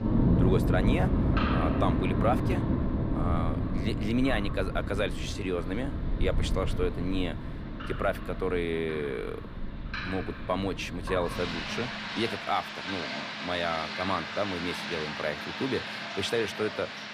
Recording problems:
rain or running water; very loud; throughout; 1 dB above the speech

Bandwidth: 15 kHz